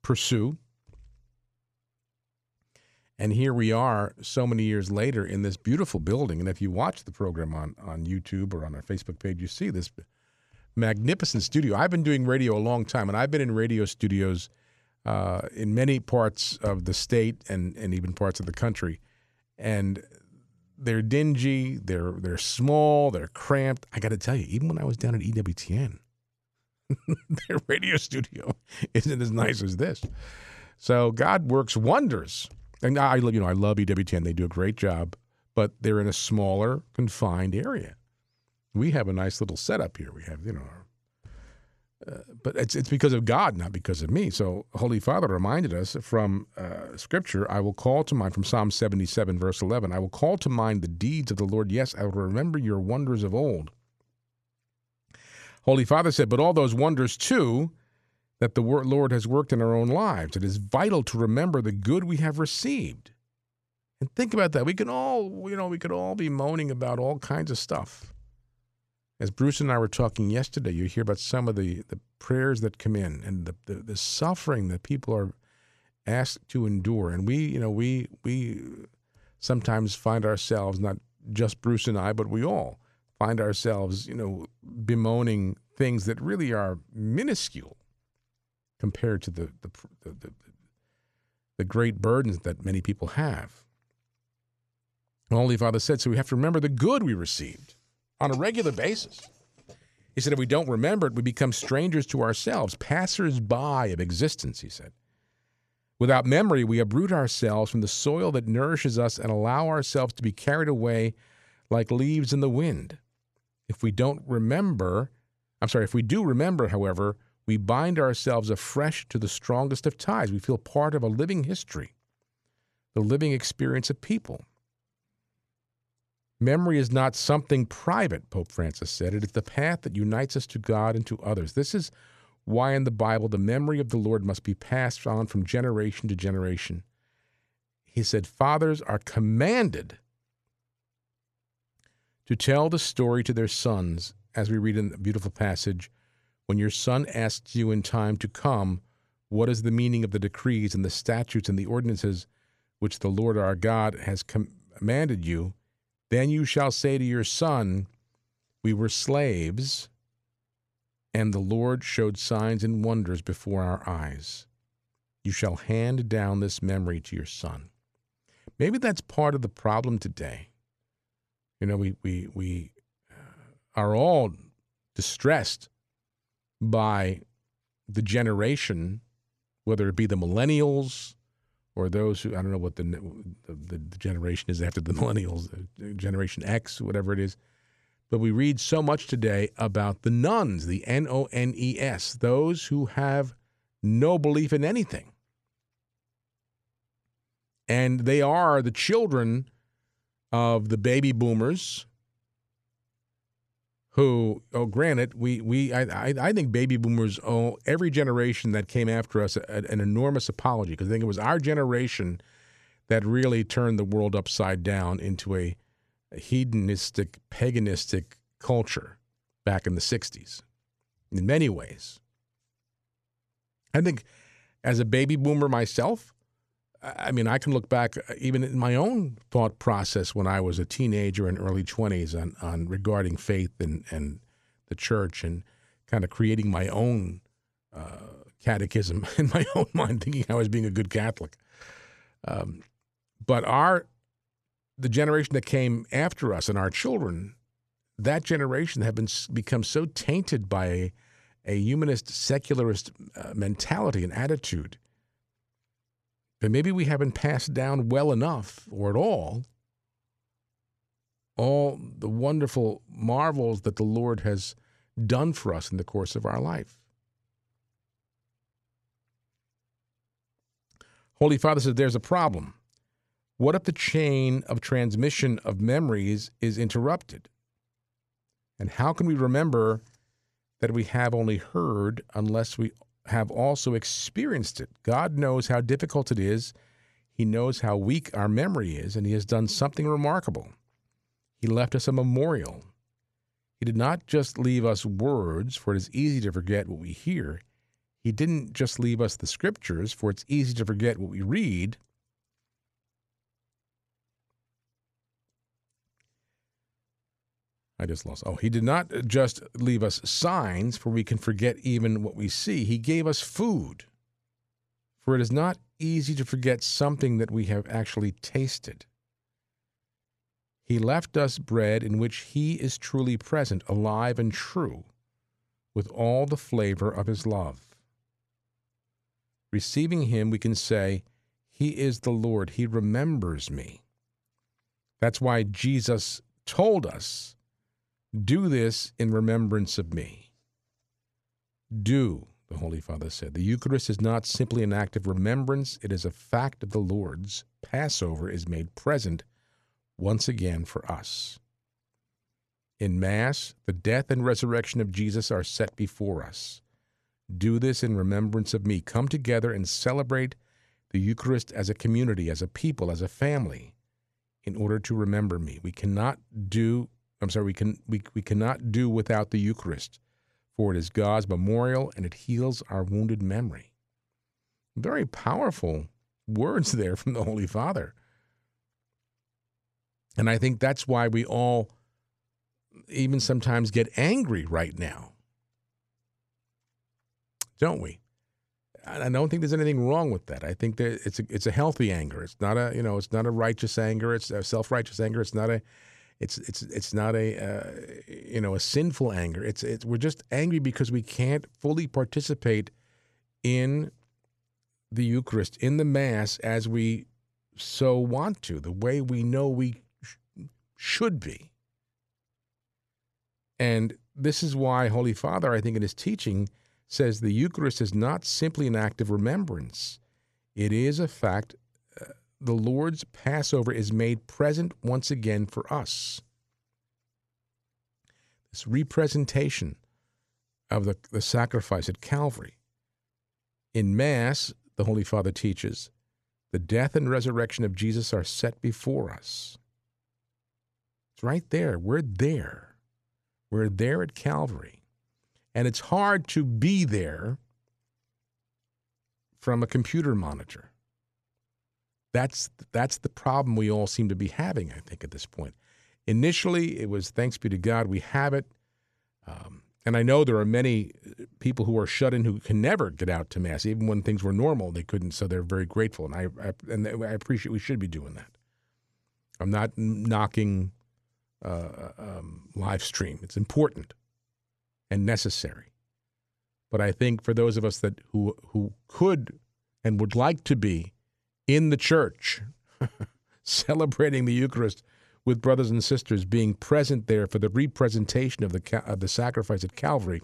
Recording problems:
none

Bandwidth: 13.5 kHz